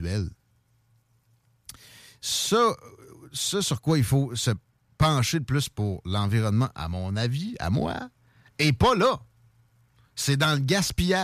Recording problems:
abrupt cut into speech; at the start and the end

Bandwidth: 14.5 kHz